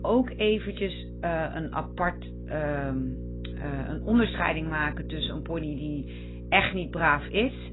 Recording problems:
garbled, watery; badly; nothing above 4 kHz
electrical hum; noticeable; throughout; 60 Hz, 20 dB below the speech

